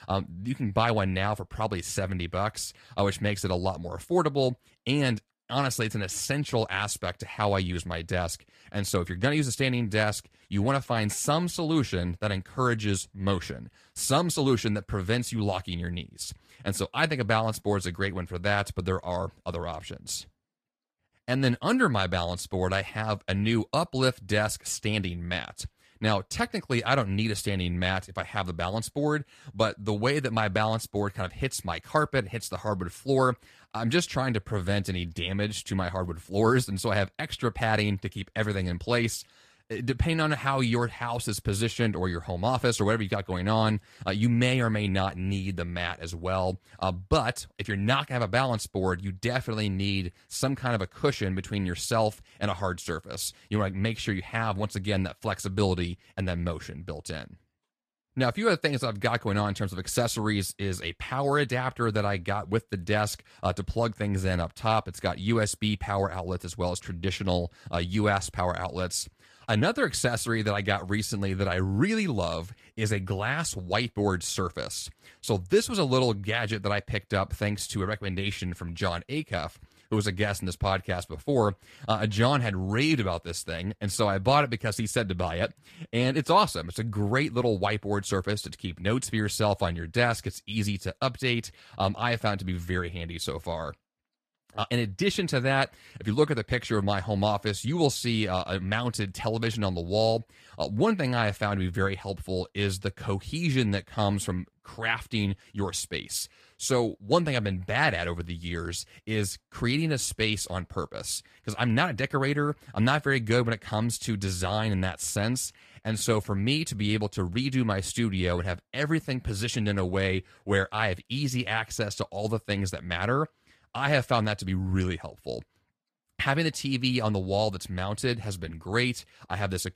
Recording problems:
garbled, watery; slightly; nothing above 14.5 kHz

